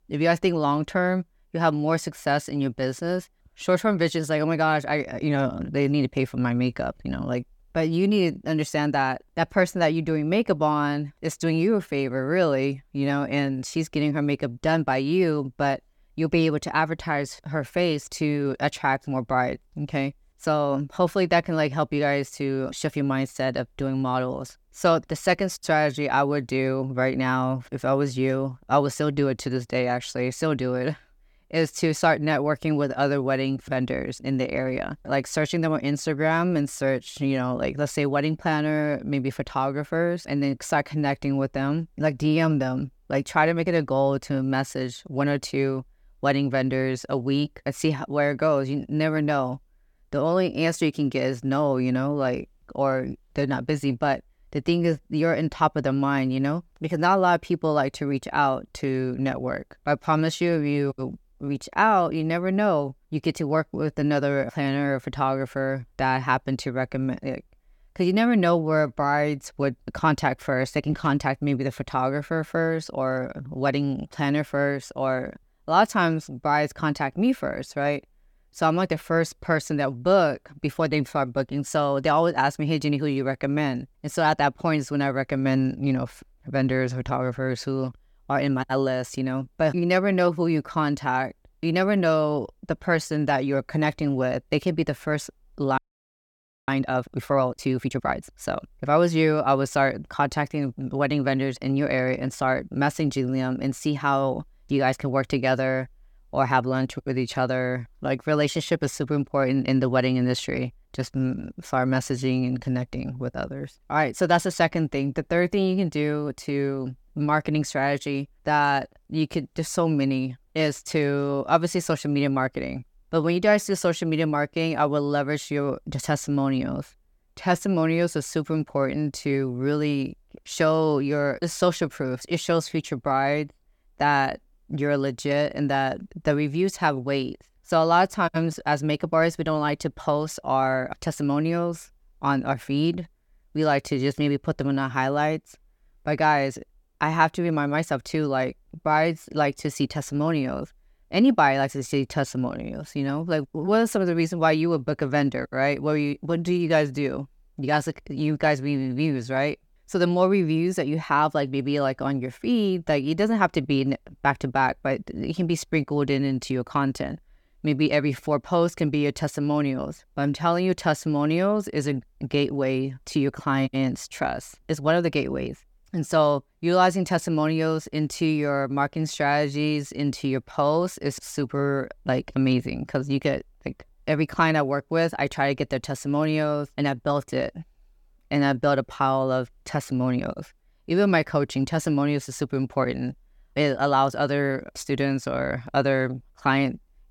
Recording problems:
audio freezing; at 1:36 for 1 s

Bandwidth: 18 kHz